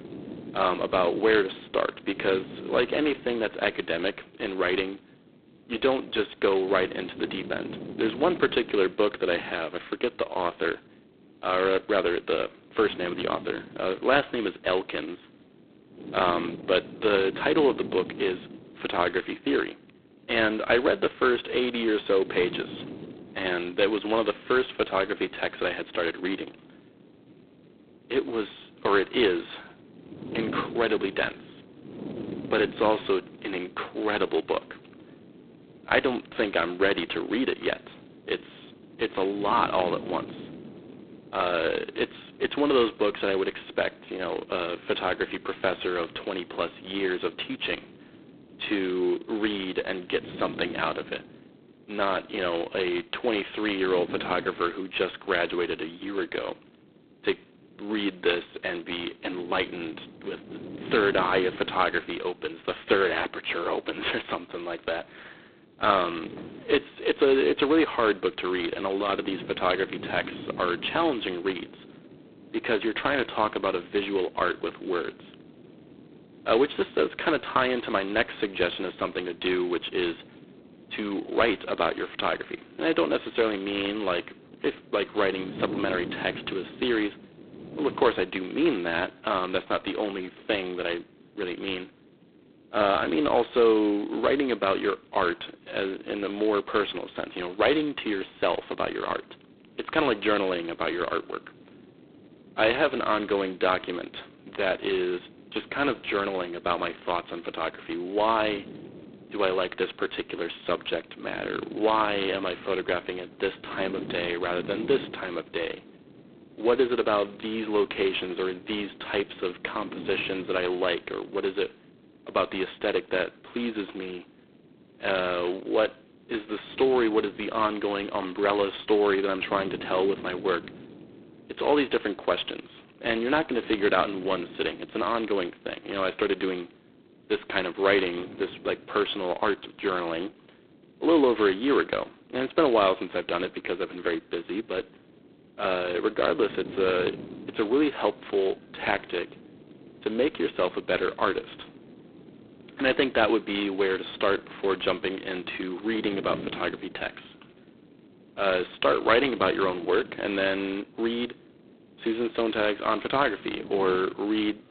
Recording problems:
phone-call audio; poor line; nothing above 4 kHz
wind noise on the microphone; occasional gusts; 20 dB below the speech

